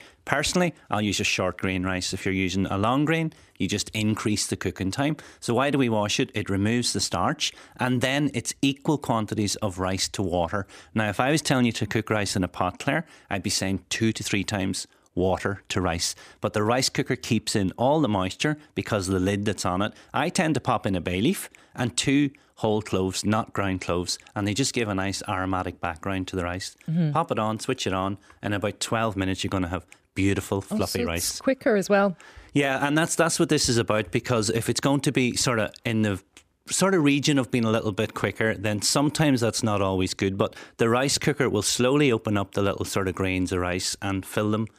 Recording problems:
none

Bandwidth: 15 kHz